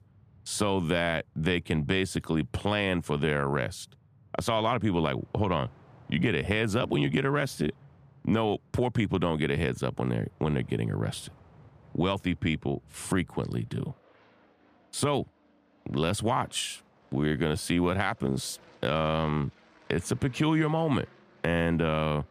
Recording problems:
train or aircraft noise; faint; throughout; 30 dB below the speech

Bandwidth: 15 kHz